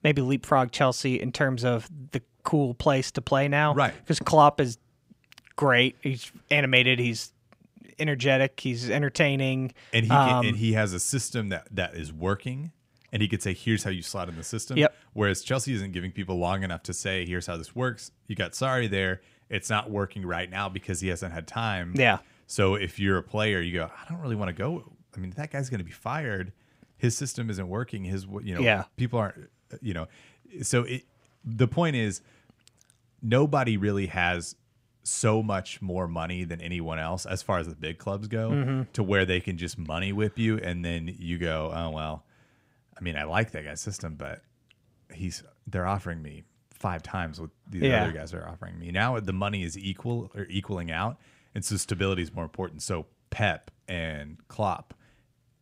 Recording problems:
none

